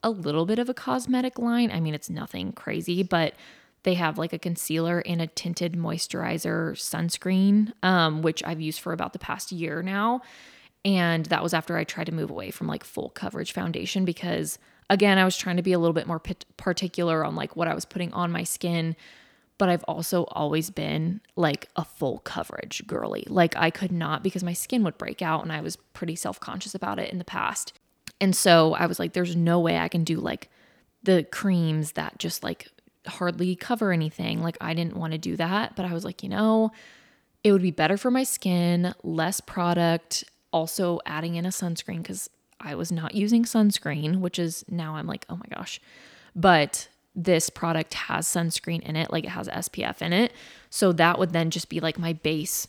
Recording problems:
none

